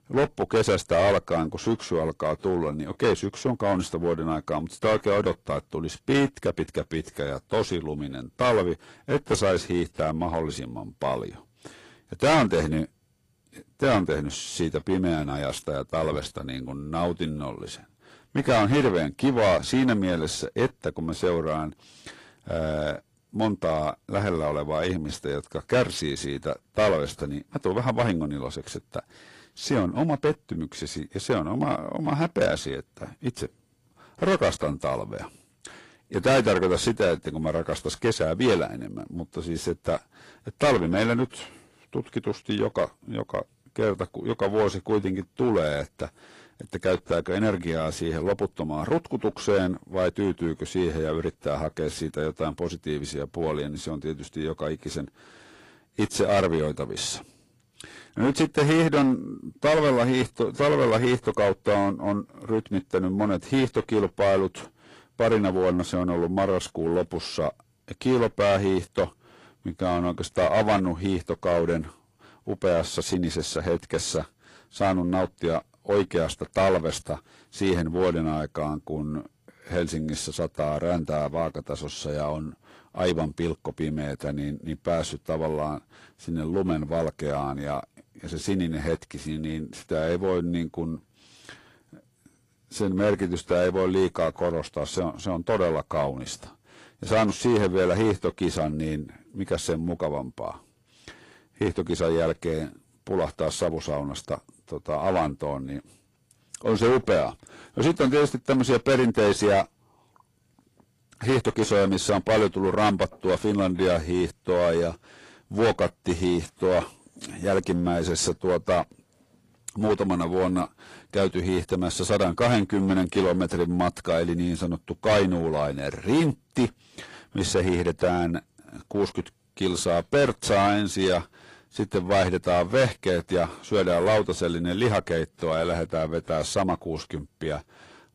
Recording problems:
distortion; heavy; 5% of the sound clipped
garbled, watery; slightly; nothing above 11 kHz

